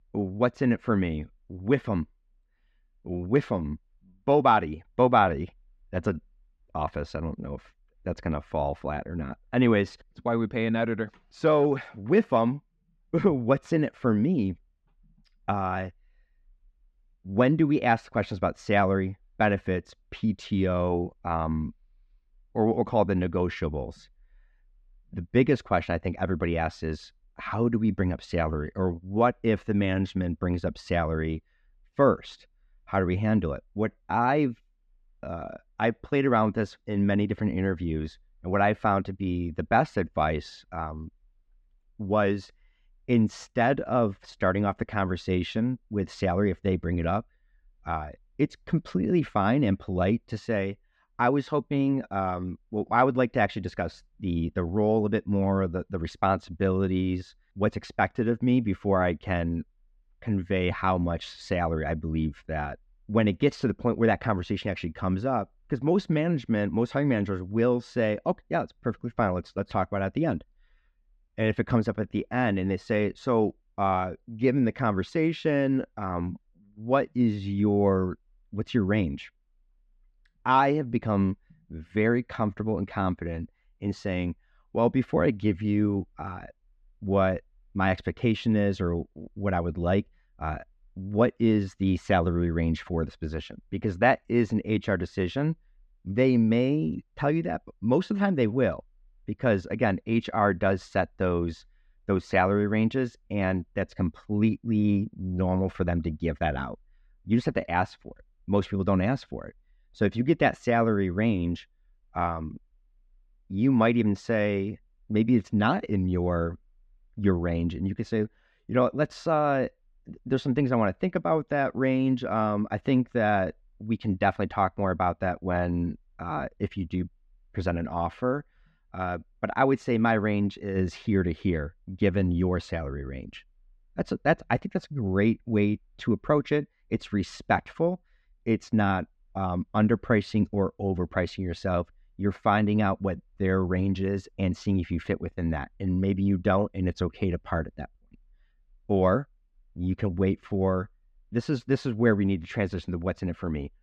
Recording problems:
muffled; slightly; fading above 3 kHz

